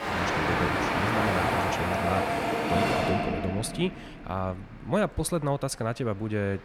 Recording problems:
train or aircraft noise; very loud; throughout; 4 dB above the speech

